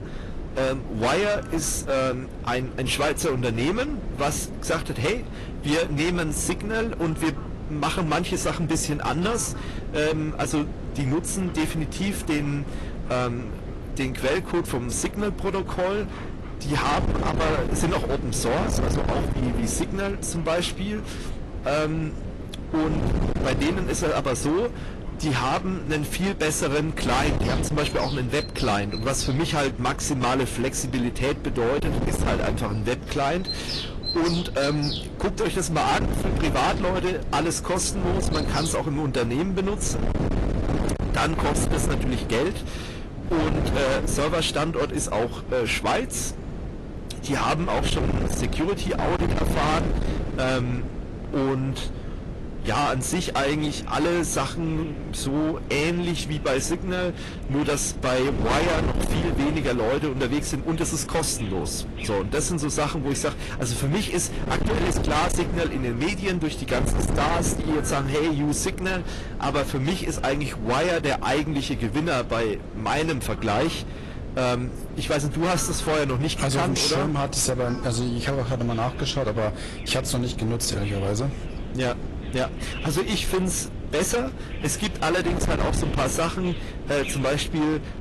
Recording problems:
distortion; heavy; 21% of the sound clipped
garbled, watery; slightly; nothing above 11.5 kHz
wind noise on the microphone; heavy; 10 dB below the speech
animal sounds; noticeable; throughout; 15 dB below the speech

